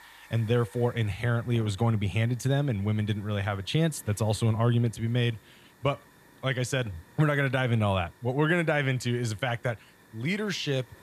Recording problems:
hiss; faint; throughout; 25 dB below the speech

